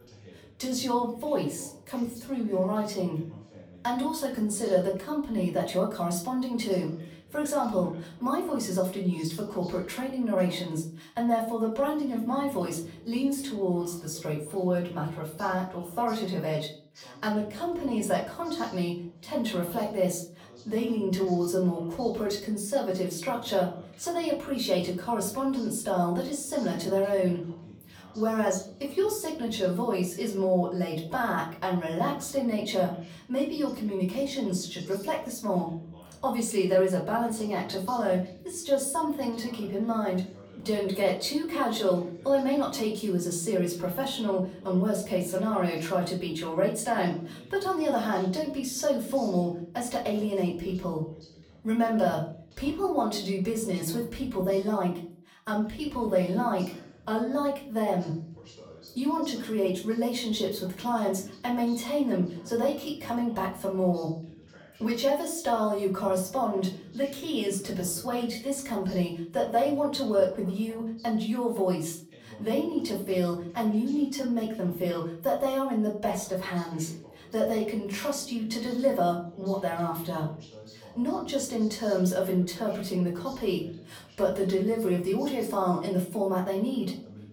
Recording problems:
off-mic speech; far
room echo; slight; dies away in 0.4 s
voice in the background; faint; throughout; 20 dB below the speech

